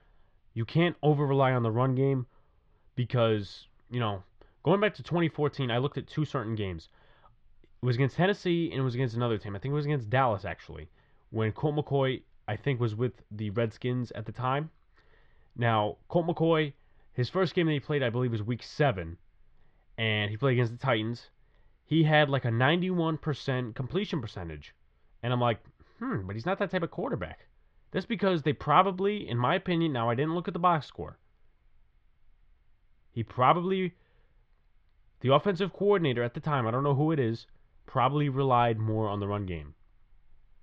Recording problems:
muffled; very; fading above 3.5 kHz

